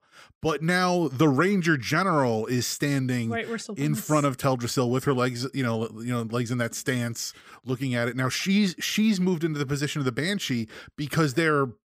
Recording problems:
none

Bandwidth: 15 kHz